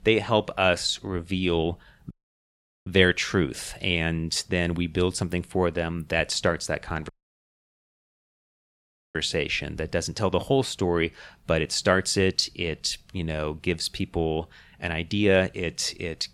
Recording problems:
audio cutting out; at 2 s for 1 s and at 7 s for 2 s

